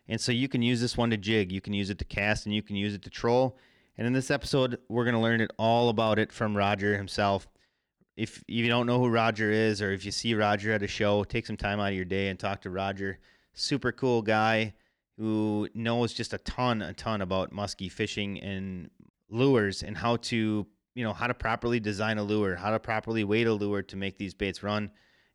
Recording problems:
none

